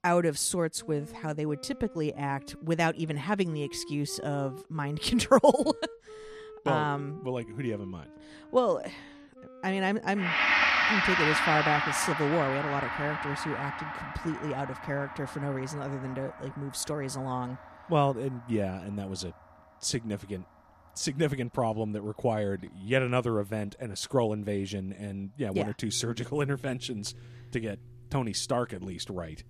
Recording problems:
background music; very loud; throughout; 1 dB above the speech

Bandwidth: 14.5 kHz